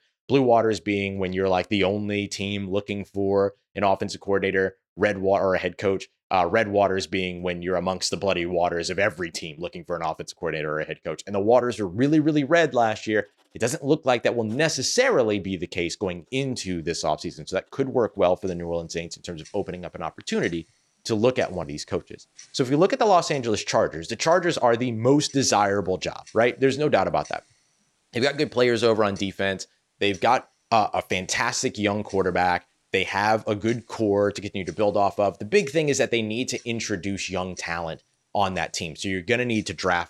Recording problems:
household noises; faint; from 13 s on; 25 dB below the speech

